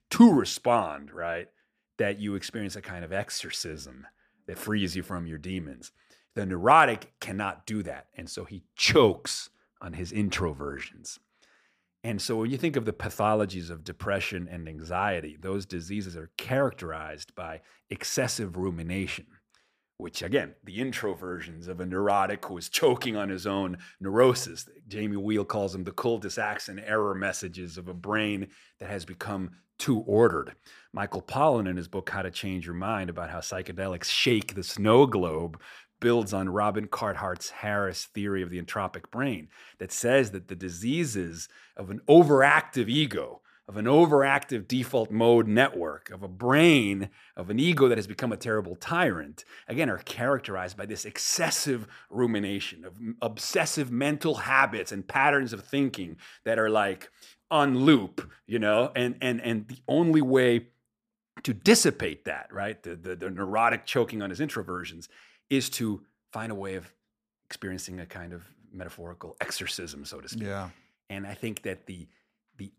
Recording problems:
none

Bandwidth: 14.5 kHz